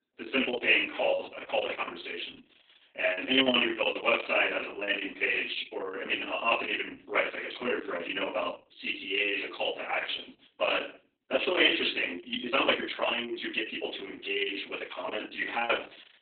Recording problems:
off-mic speech; far
garbled, watery; badly
room echo; slight; dies away in 0.4 s
thin; very slightly; fading below 250 Hz
uneven, jittery; strongly; from 1 to 15 s

